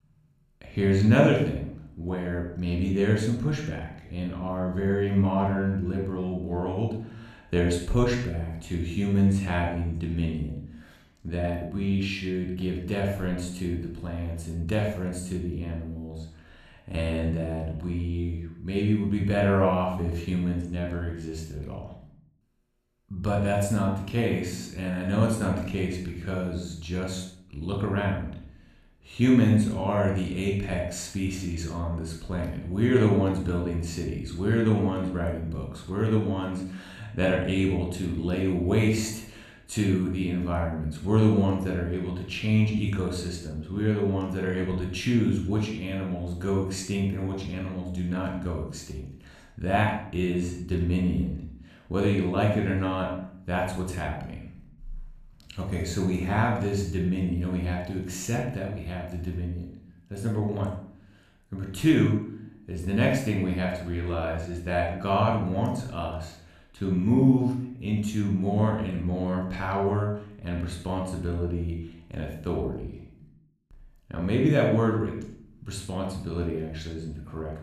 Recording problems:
room echo; noticeable; dies away in 0.6 s
off-mic speech; somewhat distant

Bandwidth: 14.5 kHz